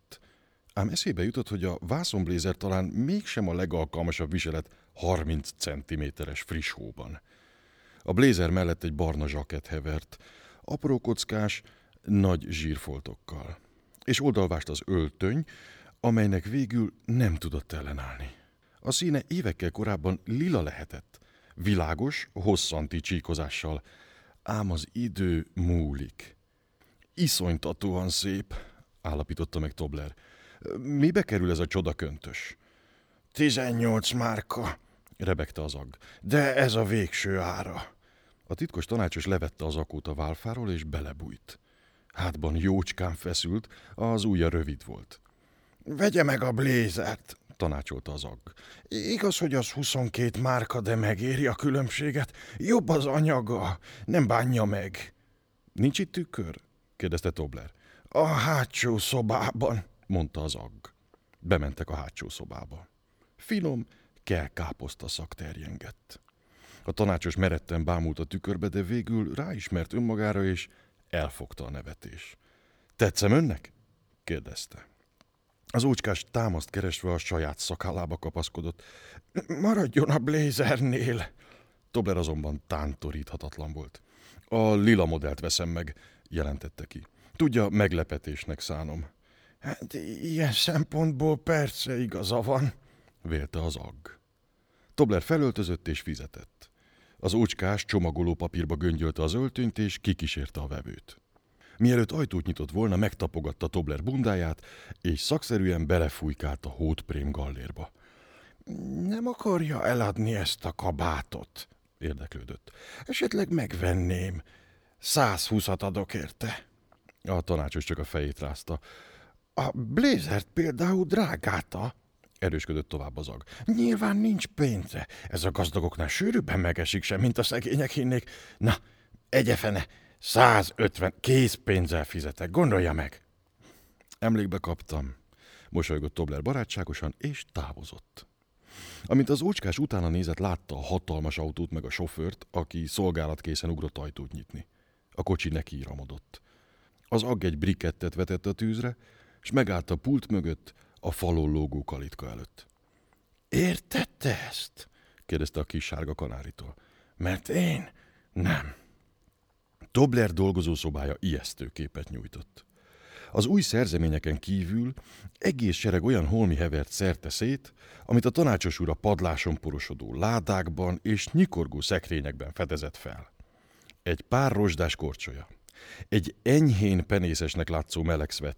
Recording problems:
none

